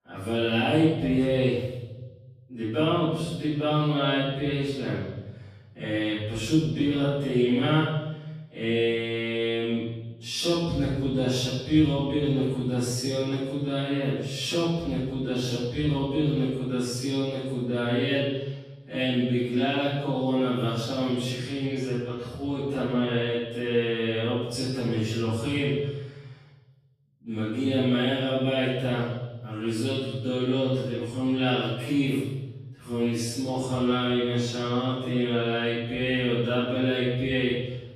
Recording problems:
room echo; strong; dies away in 1.2 s
off-mic speech; far
wrong speed, natural pitch; too slow; 0.6 times normal speed

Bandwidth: 14.5 kHz